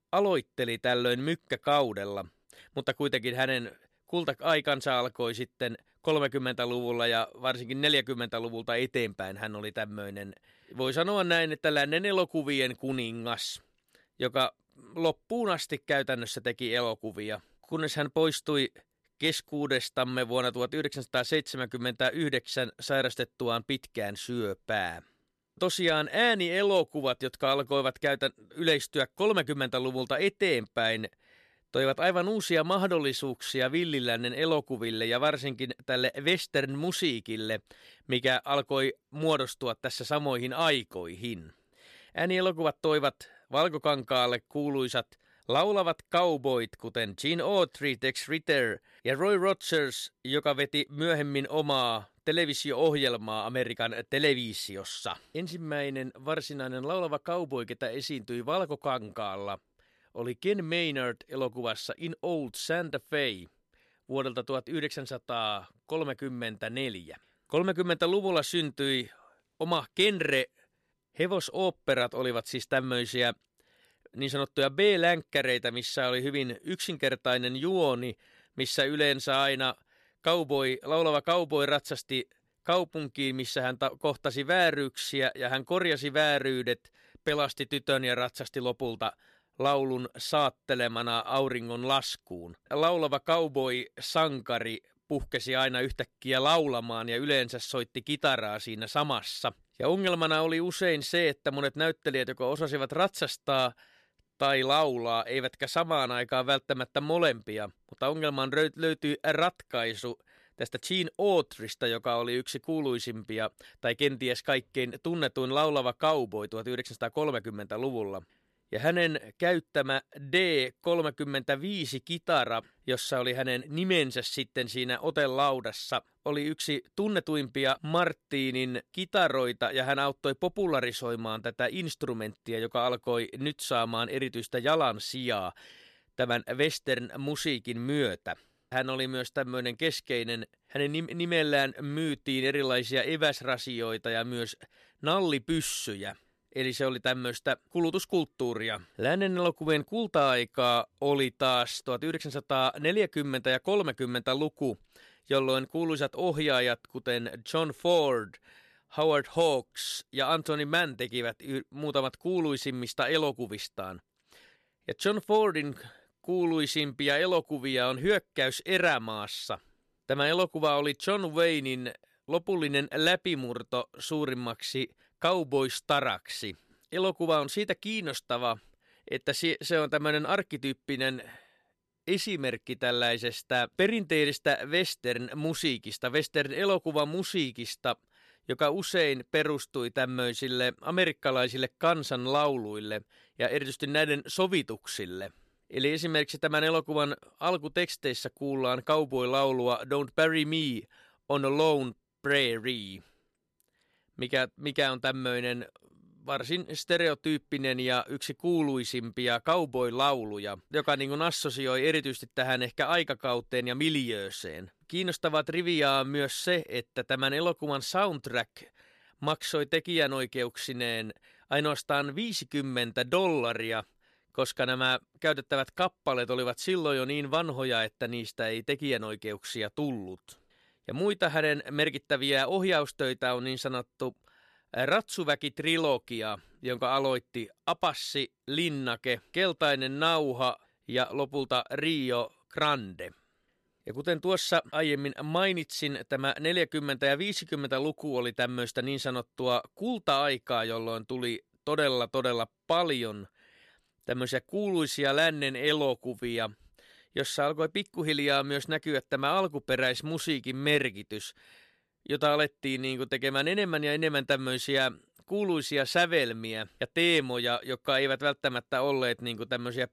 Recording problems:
none

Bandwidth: 13.5 kHz